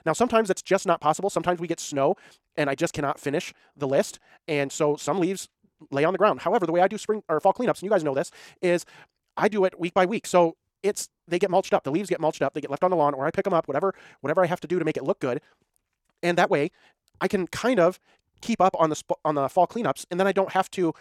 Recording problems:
wrong speed, natural pitch; too fast; 1.7 times normal speed

